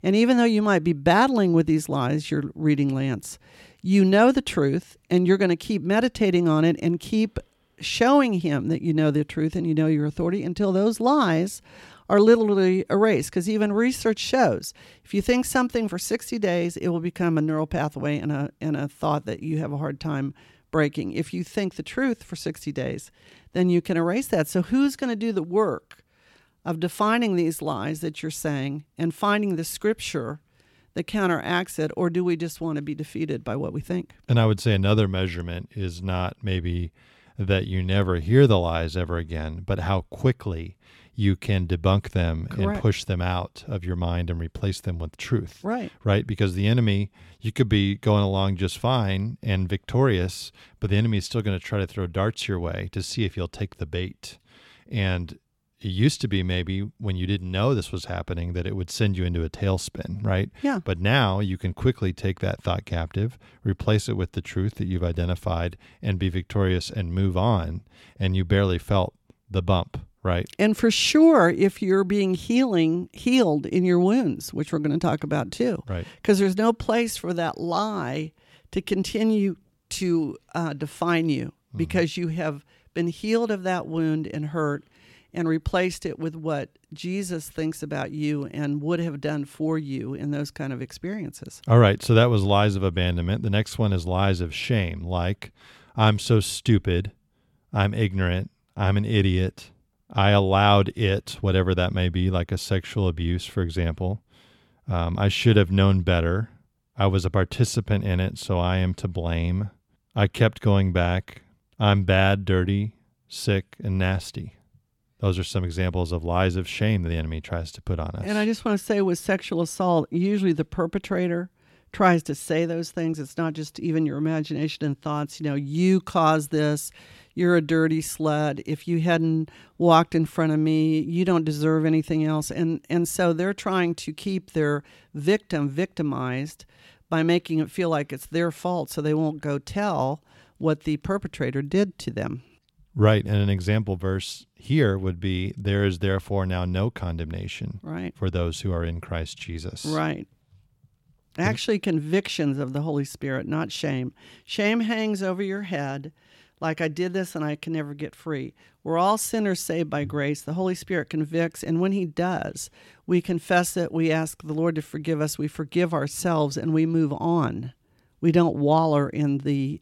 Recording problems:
none

